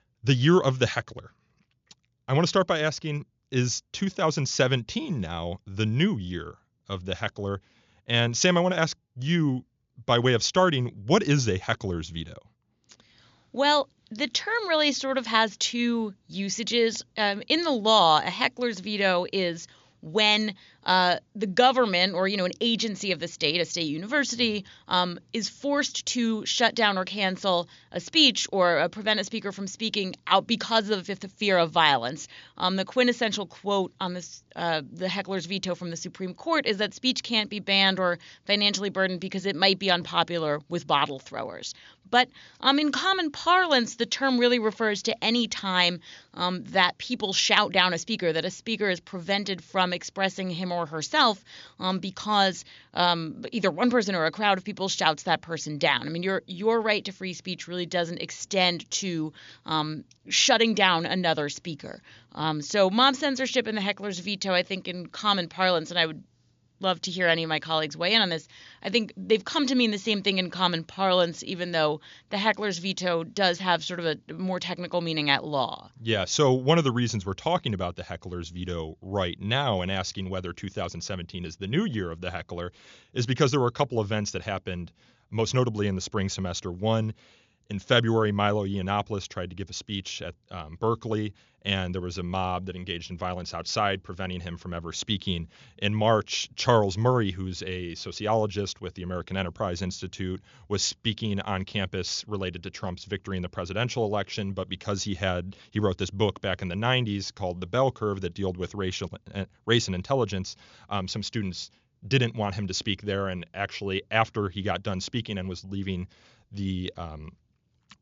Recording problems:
high frequencies cut off; noticeable; nothing above 7 kHz

